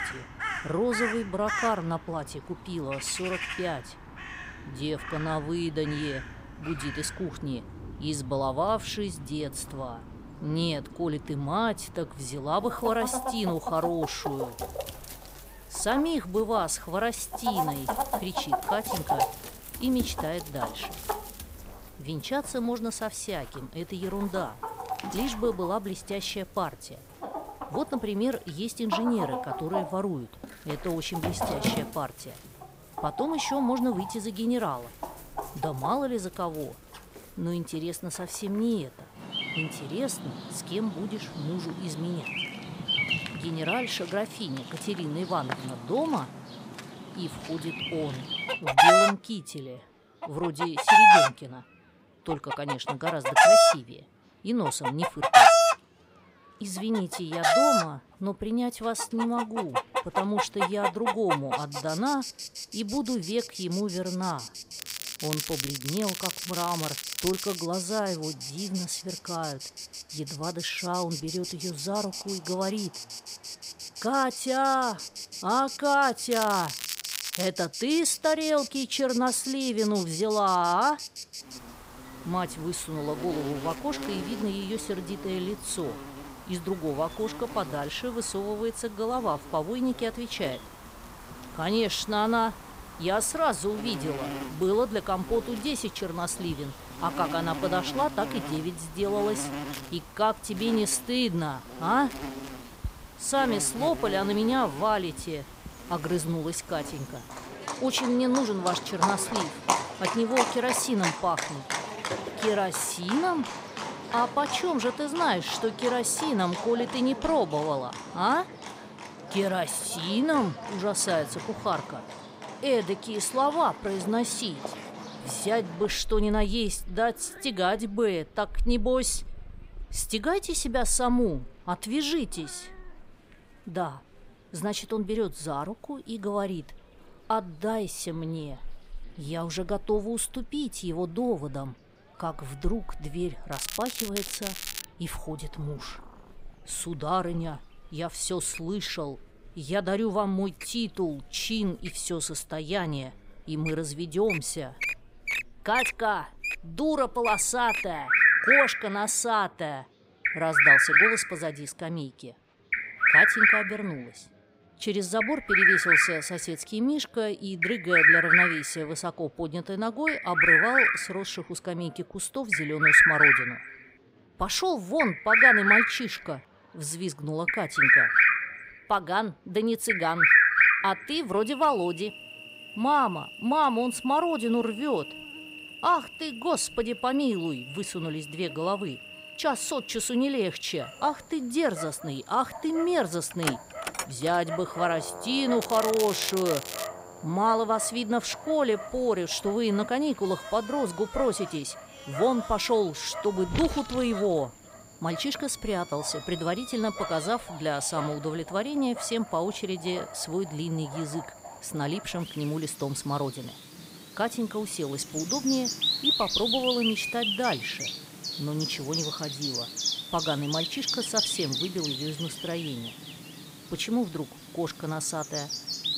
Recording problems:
animal sounds; very loud; throughout; 3 dB above the speech
crackling; loud; 4 times, first at 1:05; 5 dB below the speech
murmuring crowd; faint; throughout; 30 dB below the speech

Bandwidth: 15.5 kHz